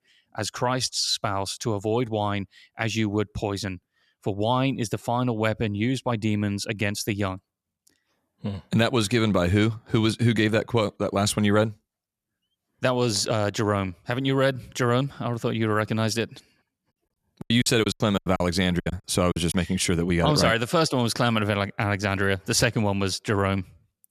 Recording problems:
choppy; very; from 17 to 20 s; 20% of the speech affected

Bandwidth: 14 kHz